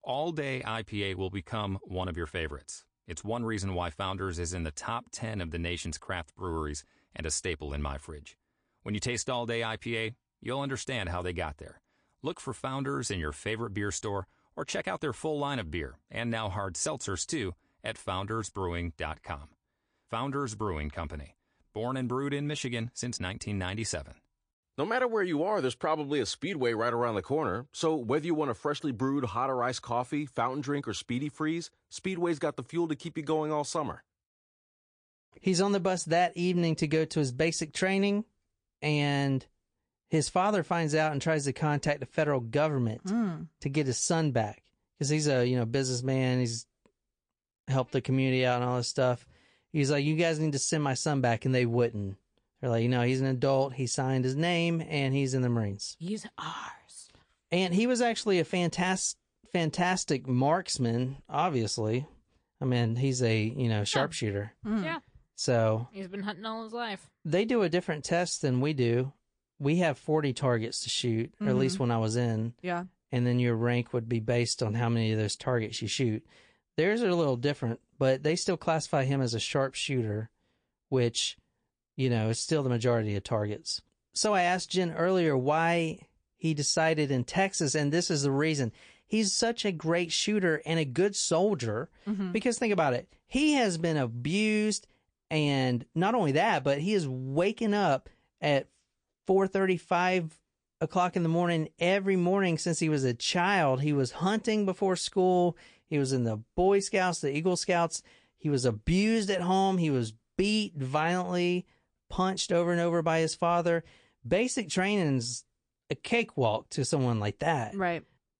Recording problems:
garbled, watery; slightly; nothing above 9 kHz

